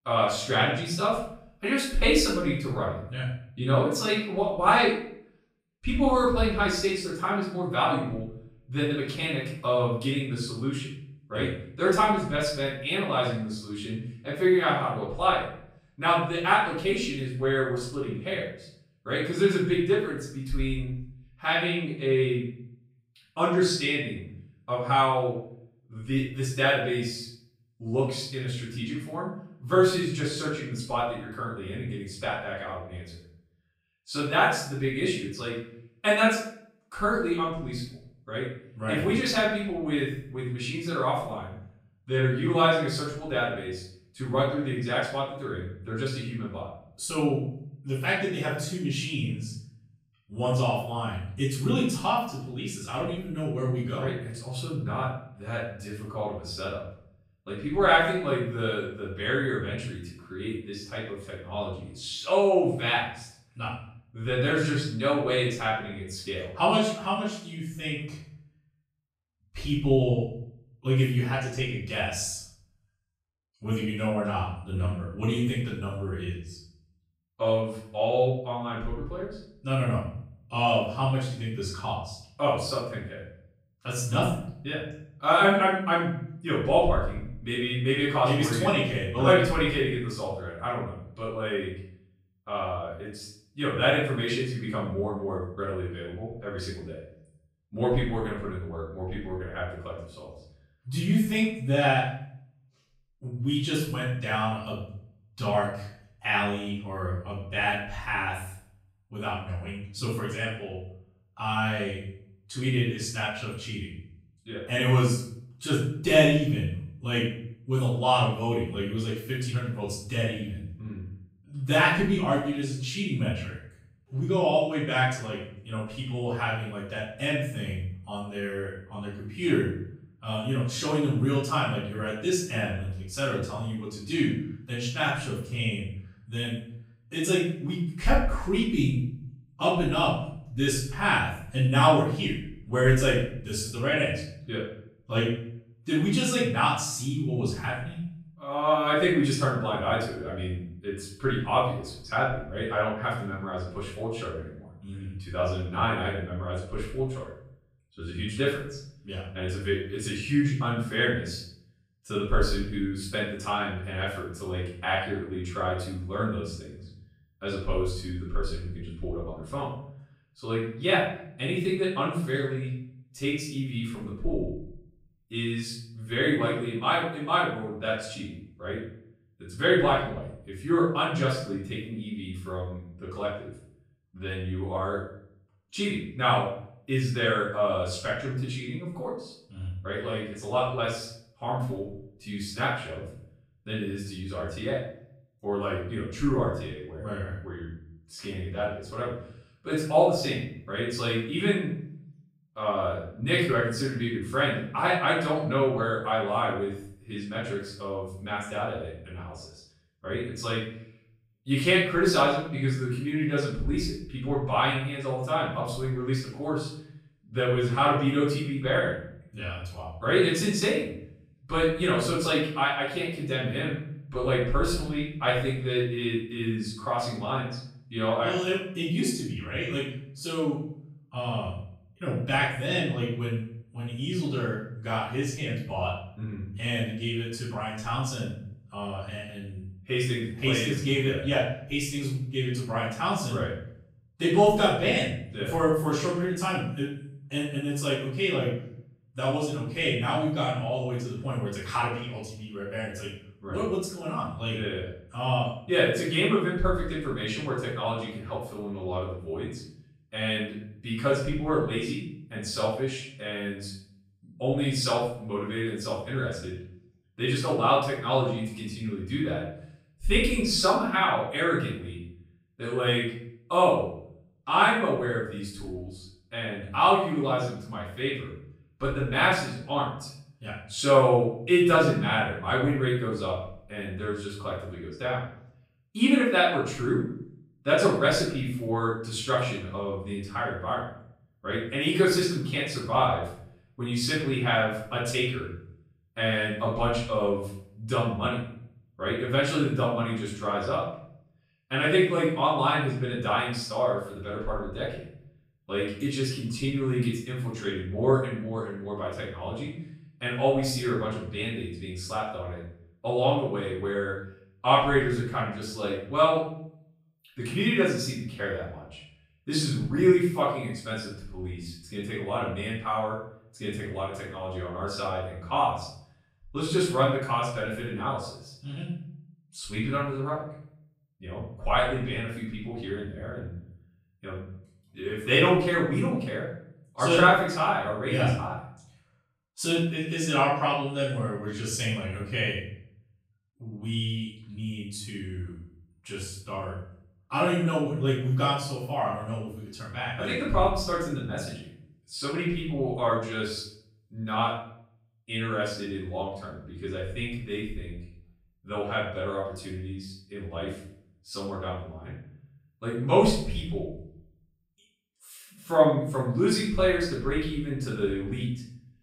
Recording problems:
off-mic speech; far
room echo; noticeable; dies away in 0.6 s

